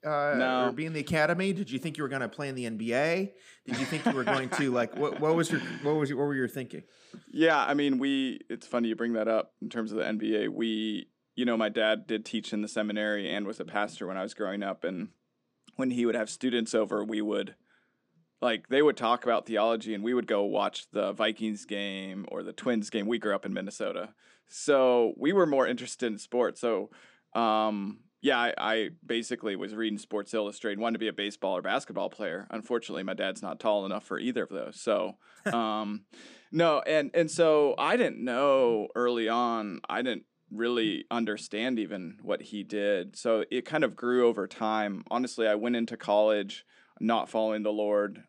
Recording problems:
none

